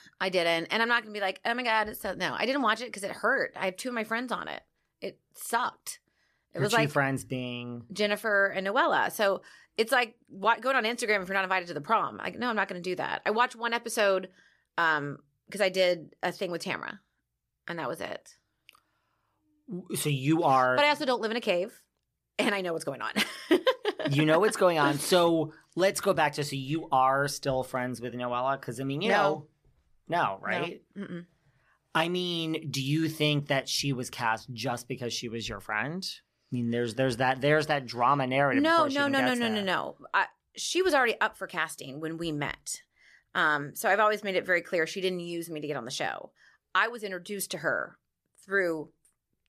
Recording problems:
none

